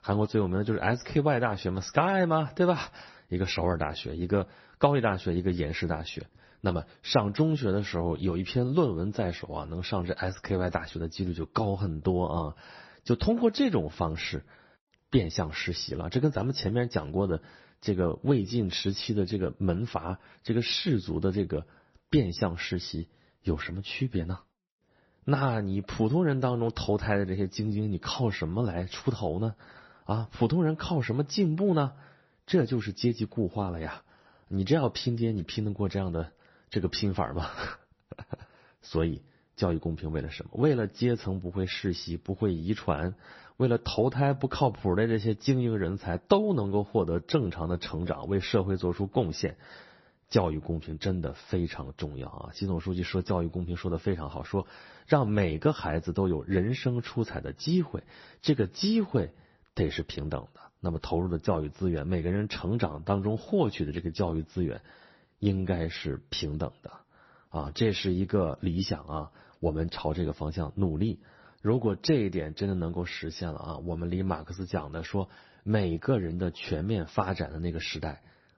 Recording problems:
garbled, watery; slightly; nothing above 6 kHz

